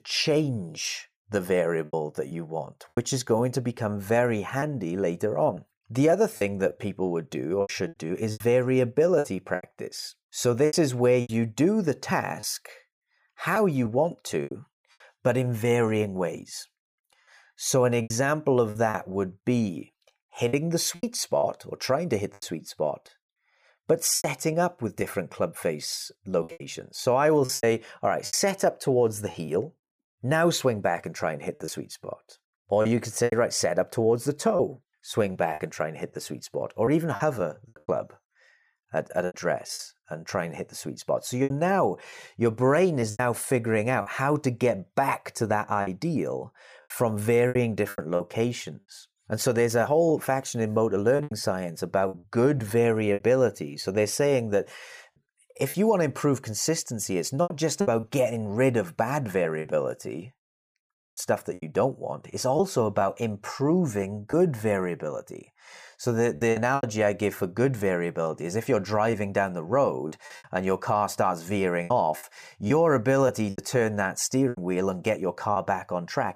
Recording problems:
choppy; very; 7% of the speech affected

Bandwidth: 15 kHz